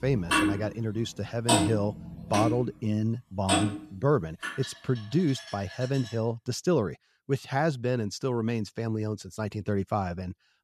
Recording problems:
household noises; very loud; until 6 s; 1 dB above the speech

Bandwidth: 13.5 kHz